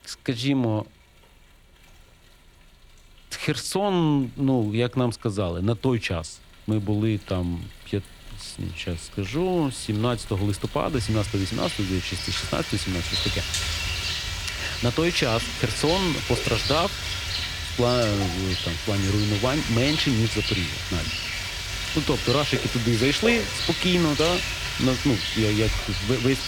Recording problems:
rain or running water; loud; throughout; 2 dB below the speech

